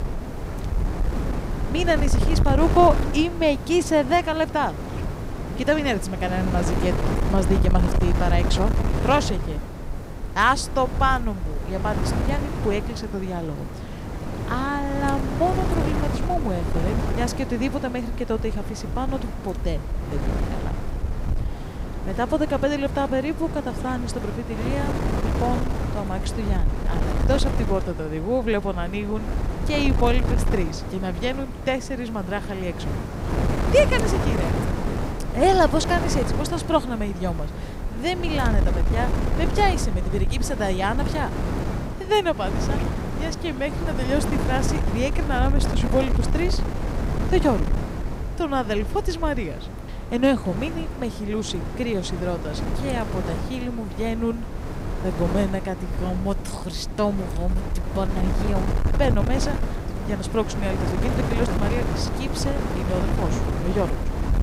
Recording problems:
wind noise on the microphone; heavy; 7 dB below the speech
hiss; faint; throughout; 30 dB below the speech

